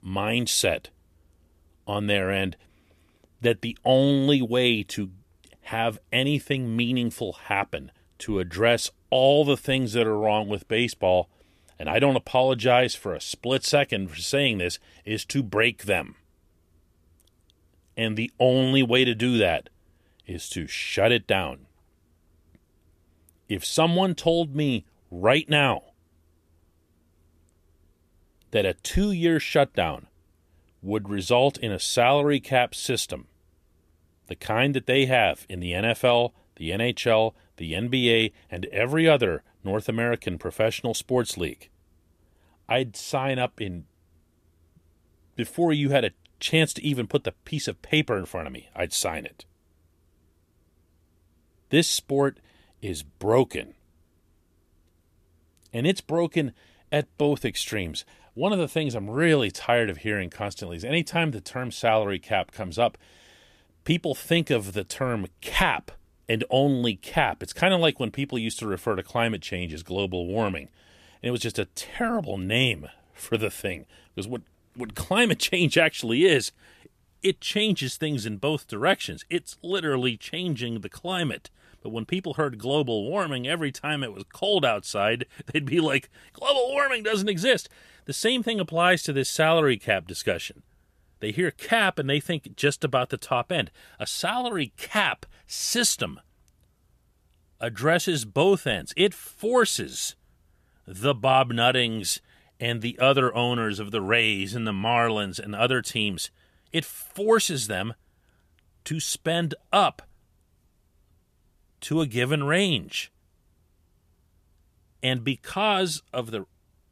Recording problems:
none

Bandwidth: 14.5 kHz